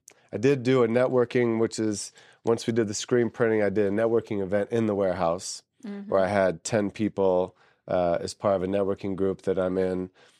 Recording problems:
none

